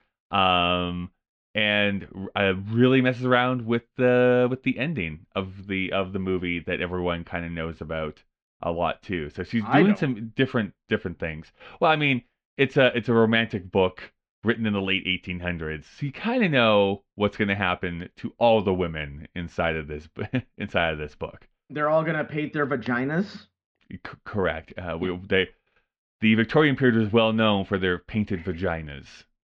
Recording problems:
muffled; slightly; fading above 4 kHz

